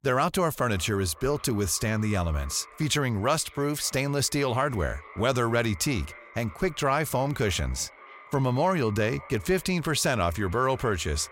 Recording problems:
echo of what is said; faint; throughout; 560 ms later, 20 dB below the speech

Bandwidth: 16 kHz